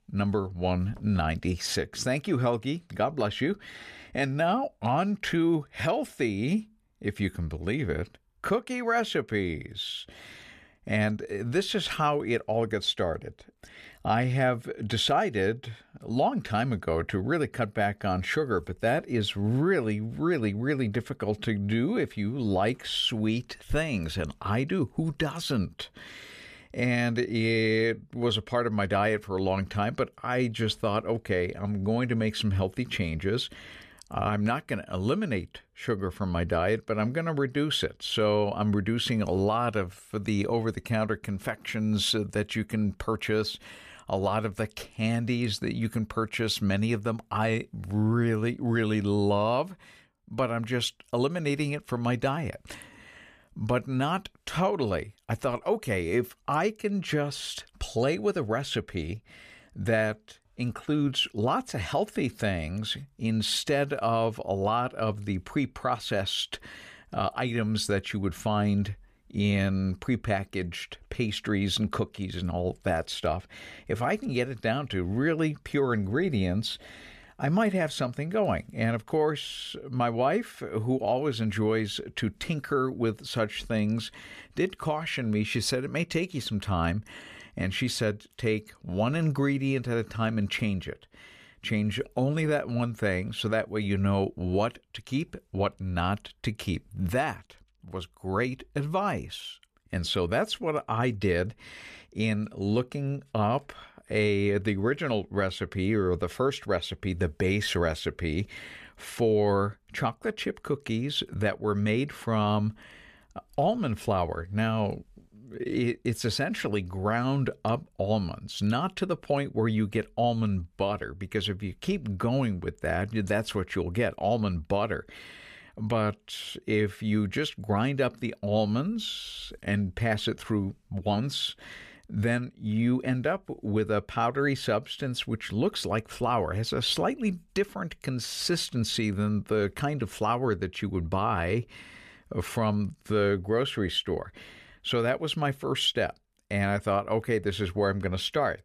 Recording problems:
none

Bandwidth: 14.5 kHz